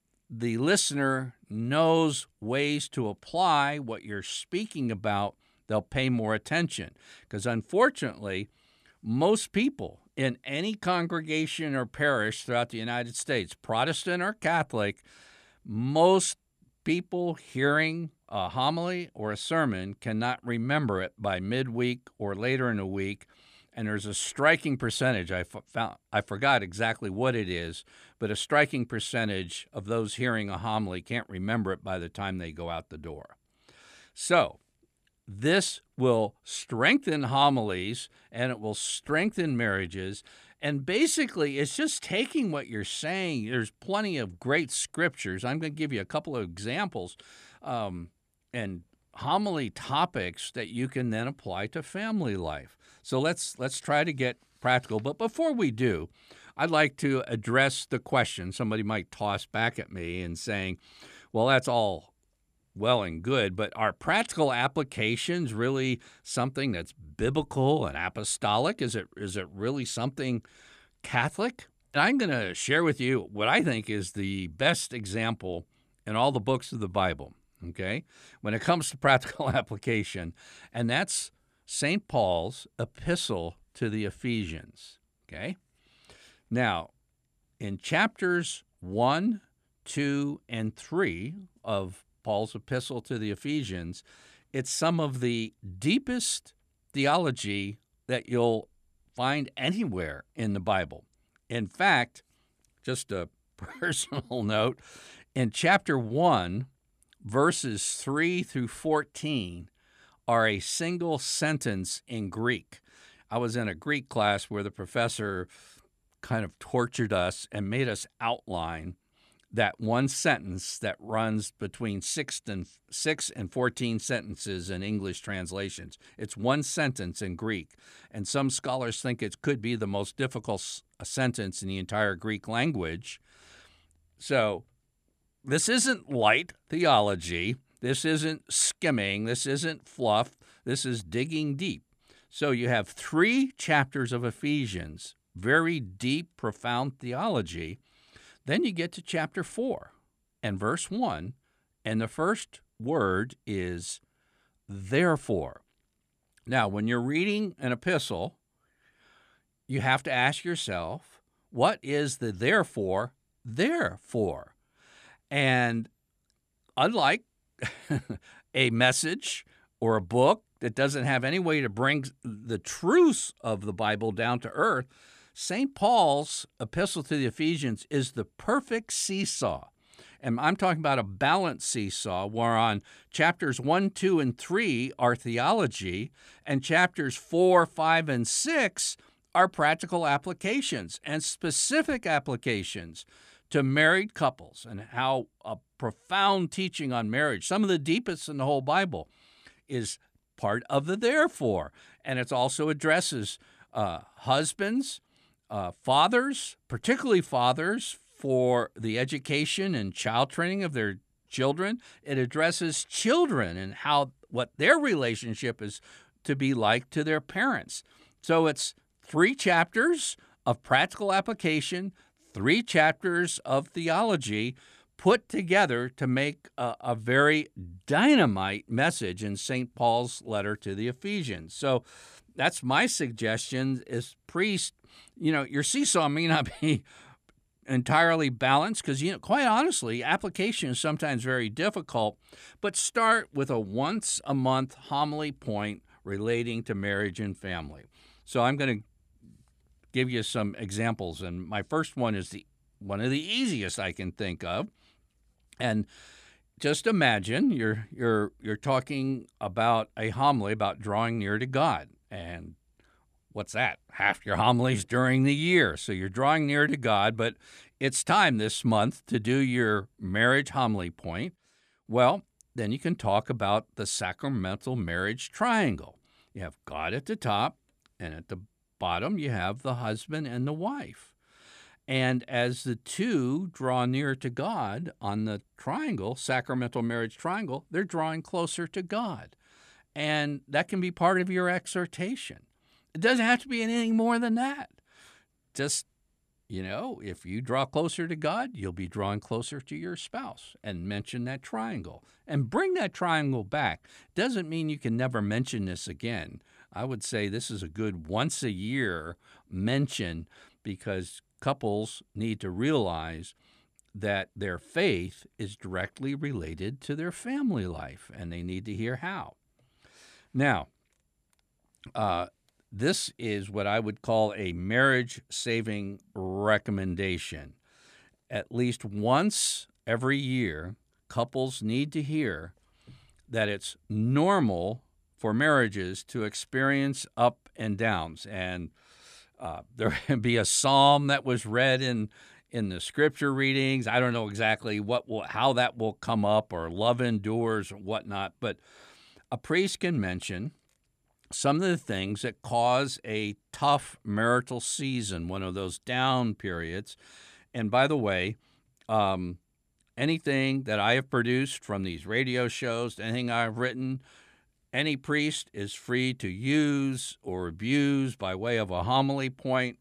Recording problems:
none

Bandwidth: 14.5 kHz